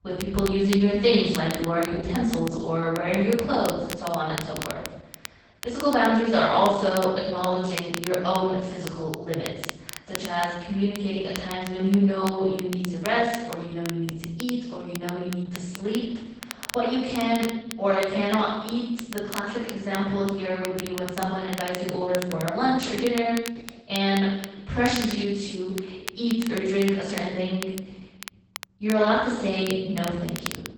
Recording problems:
off-mic speech; far
garbled, watery; badly; nothing above 8 kHz
room echo; noticeable; dies away in 0.9 s
crackle, like an old record; noticeable; 15 dB below the speech

